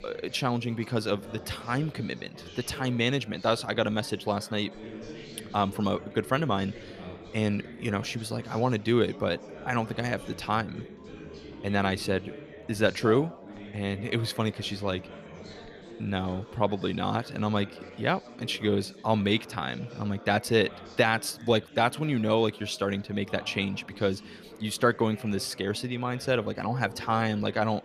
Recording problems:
chatter from many people; noticeable; throughout; 15 dB below the speech

